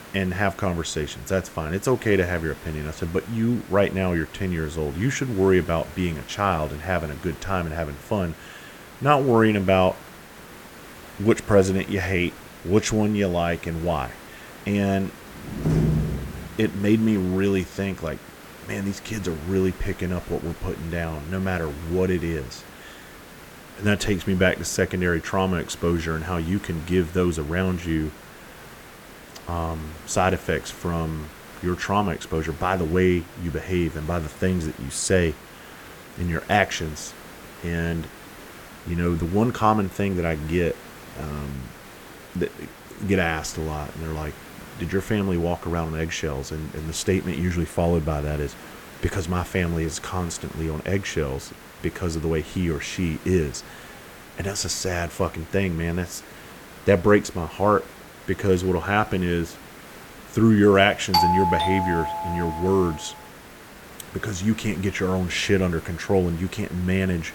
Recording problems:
hiss; noticeable; throughout; 20 dB below the speech
door banging; loud; from 15 to 16 s; peak 3 dB above the speech
doorbell; loud; from 1:01 to 1:03; peak 5 dB above the speech

